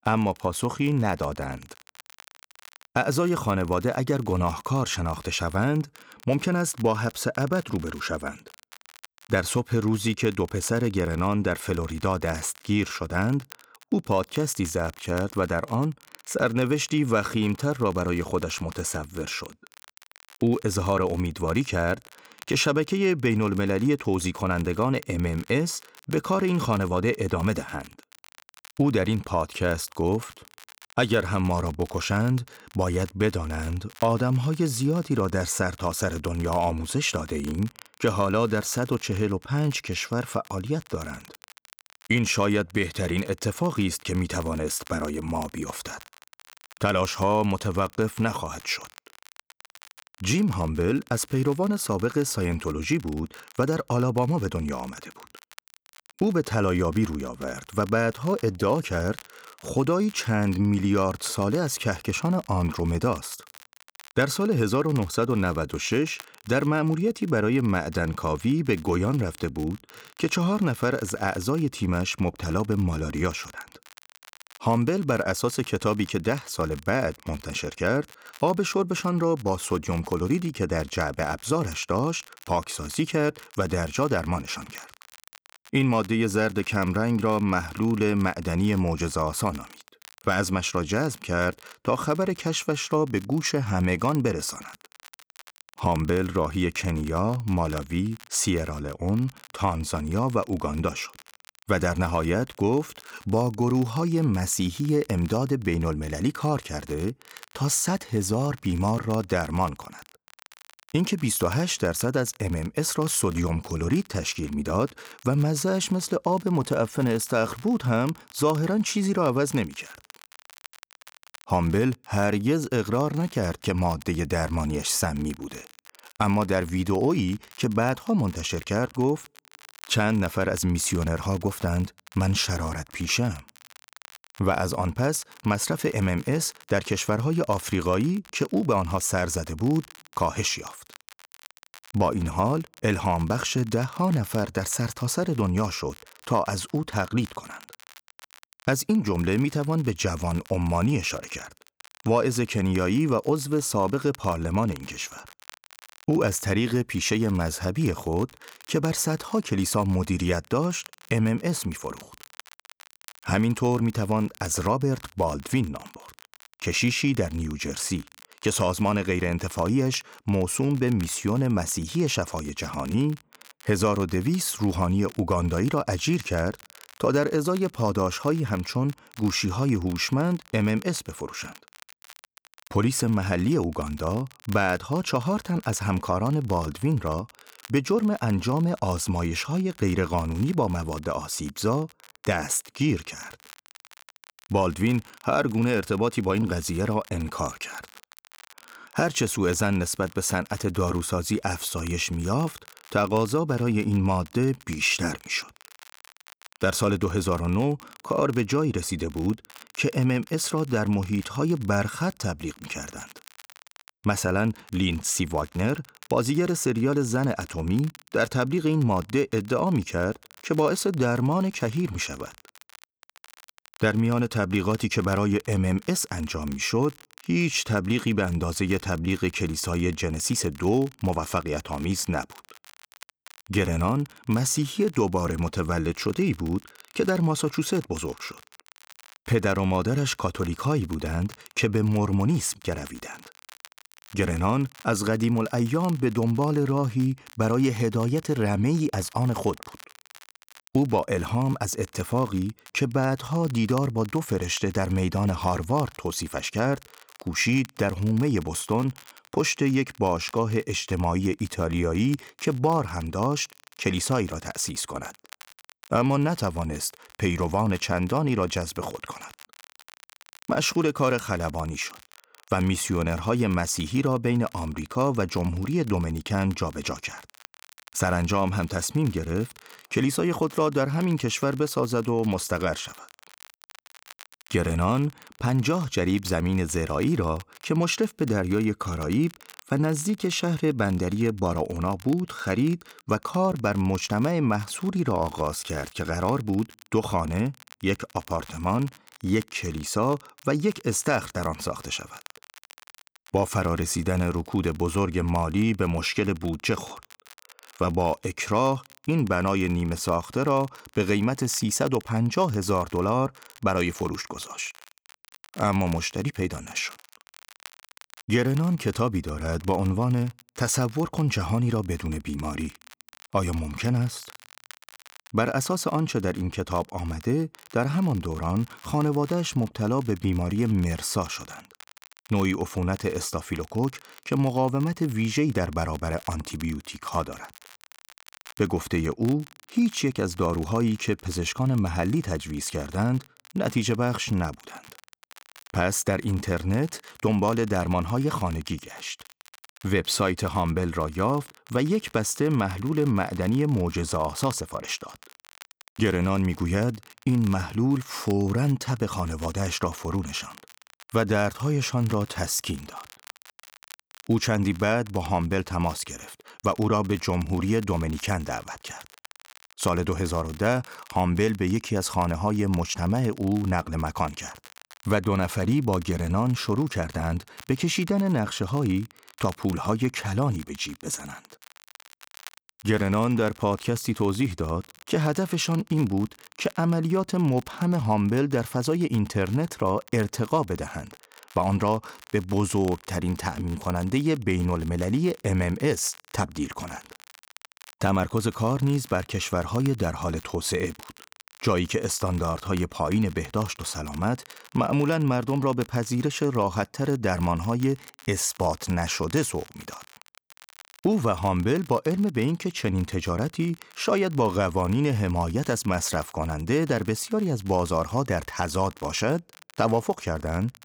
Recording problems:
crackle, like an old record; faint; 25 dB below the speech

